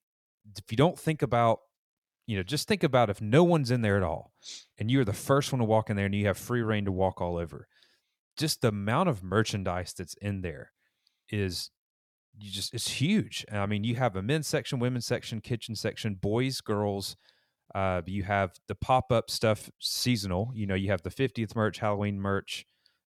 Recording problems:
none

